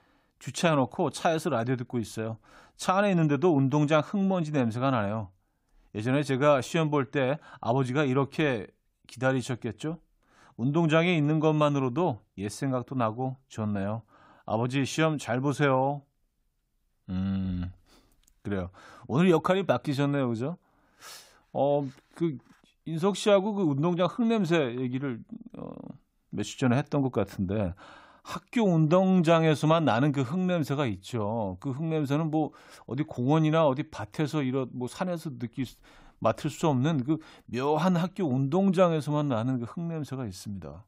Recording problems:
none

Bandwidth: 15.5 kHz